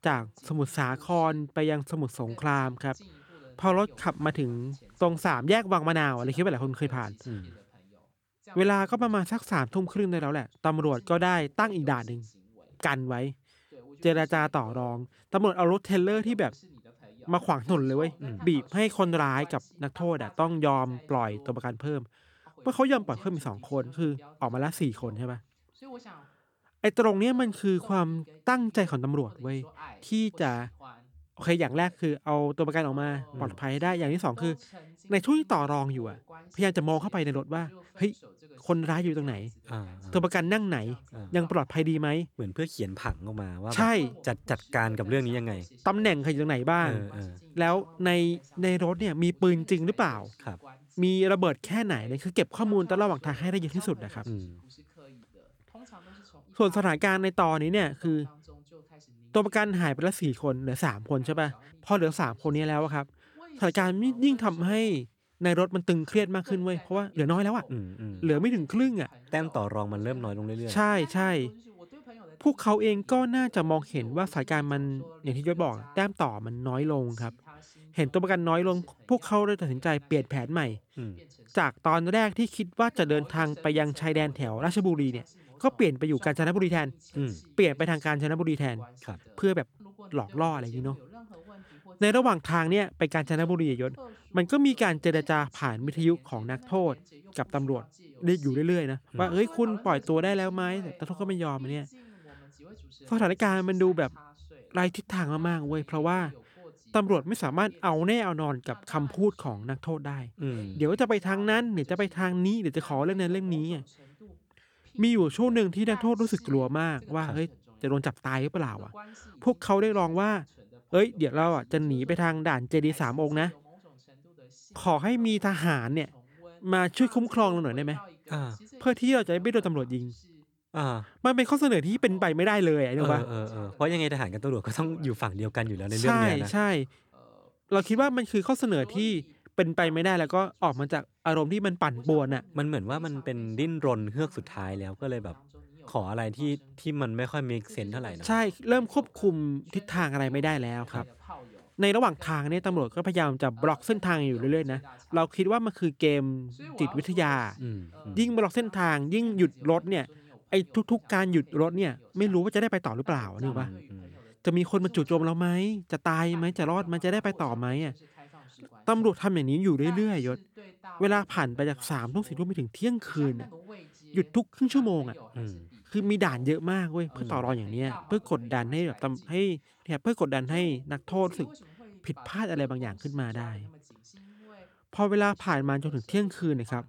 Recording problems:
voice in the background; faint; throughout; 25 dB below the speech
uneven, jittery; strongly; from 21 s to 2:59

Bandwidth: 18.5 kHz